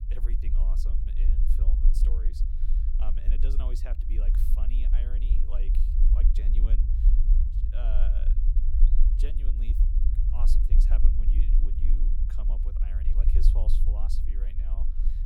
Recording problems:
low rumble; loud; throughout; 1 dB below the speech

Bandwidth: 18.5 kHz